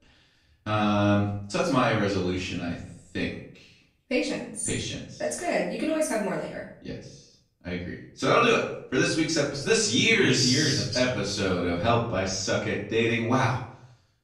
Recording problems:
off-mic speech; far
room echo; noticeable; dies away in 0.5 s

